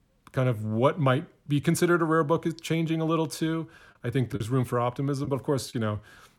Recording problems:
choppy; occasionally; 1% of the speech affected

